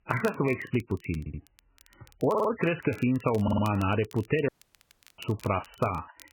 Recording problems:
garbled, watery; badly; nothing above 3 kHz
crackle, like an old record; faint; 25 dB below the speech
audio stuttering; at 1 s, at 2.5 s and at 3.5 s
audio cutting out; at 4.5 s for 0.5 s

